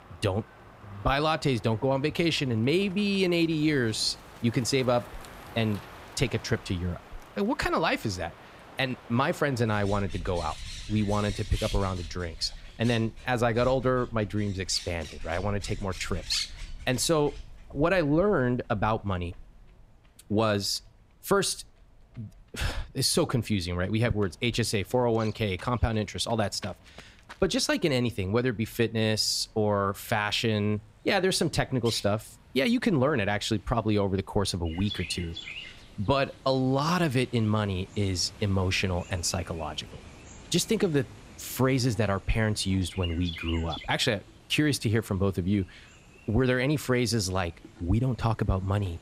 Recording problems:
animal sounds; noticeable; throughout; 15 dB below the speech

